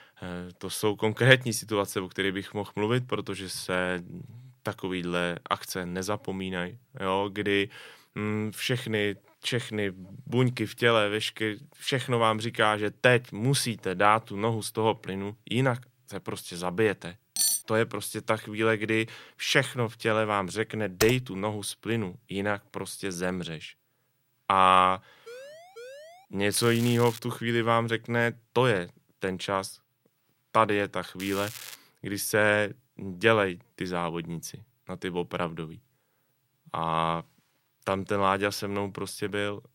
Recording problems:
crackling; noticeable; at 27 s and at 31 s; 15 dB below the speech
clattering dishes; loud; at 17 s; peak 3 dB above the speech
keyboard typing; noticeable; at 21 s; peak 4 dB below the speech
siren; faint; at 25 s; peak 15 dB below the speech

